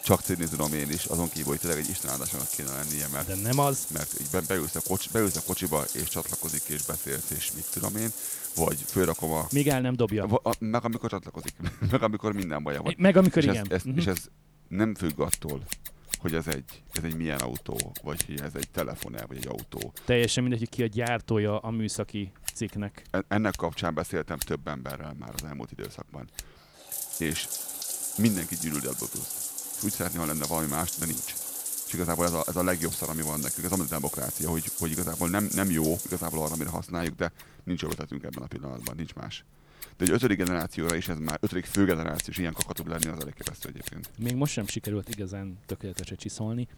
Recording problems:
household noises; loud; throughout; 3 dB below the speech

